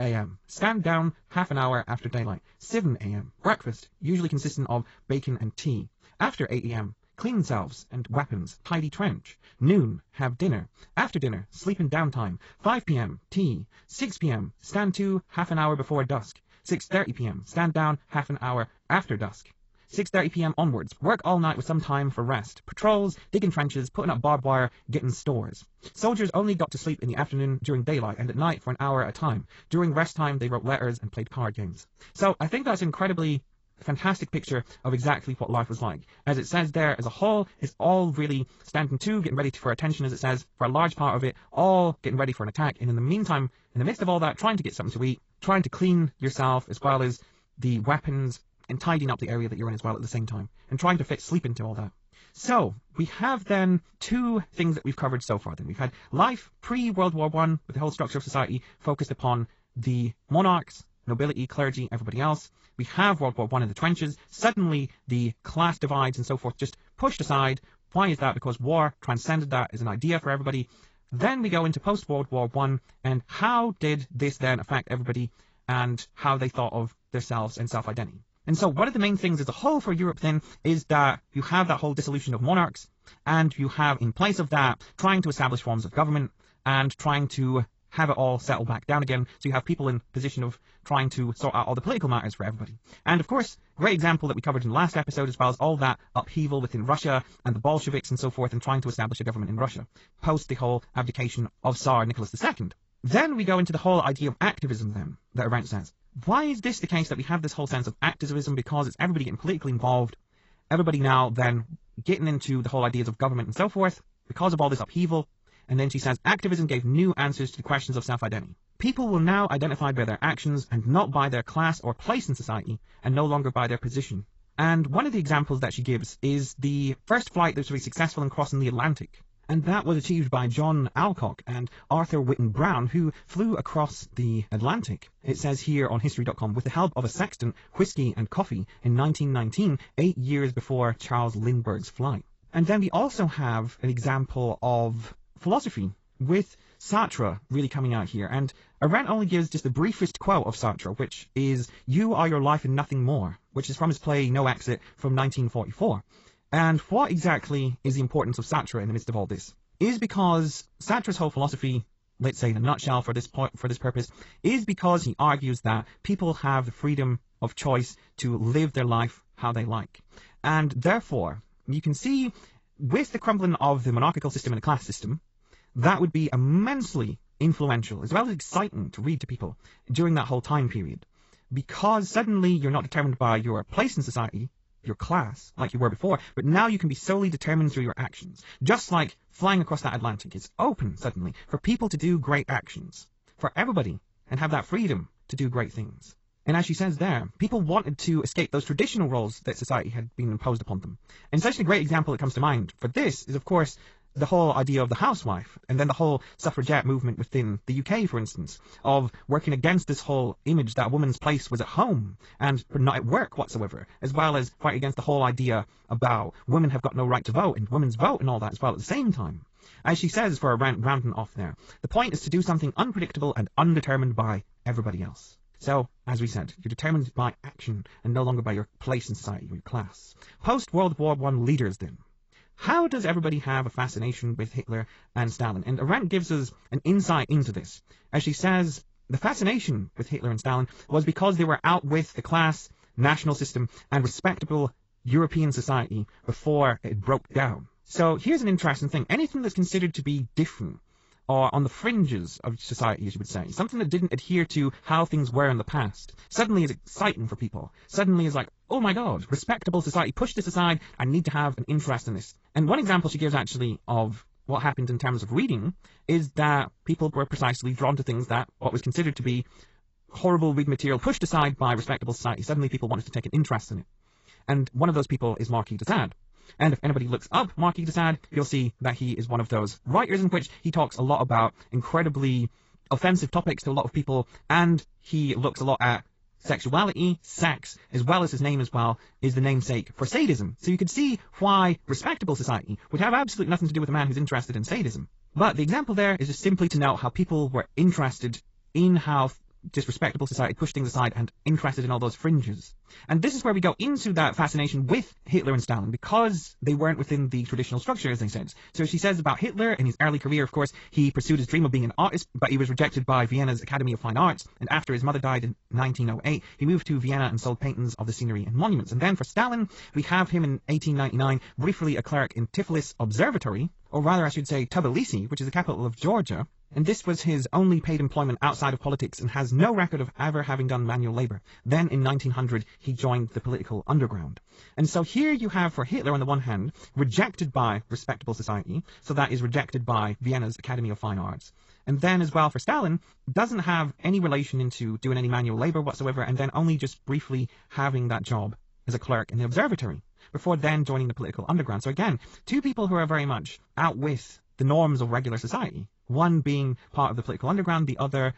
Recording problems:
garbled, watery; badly; nothing above 7.5 kHz
wrong speed, natural pitch; too fast; 1.8 times normal speed
abrupt cut into speech; at the start

